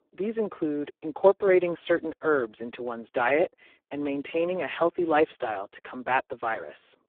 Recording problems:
phone-call audio; poor line

